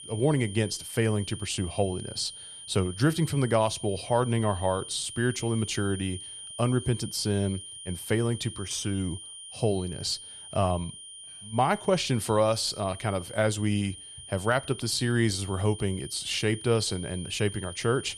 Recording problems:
high-pitched whine; noticeable; throughout; 3 kHz, 10 dB below the speech

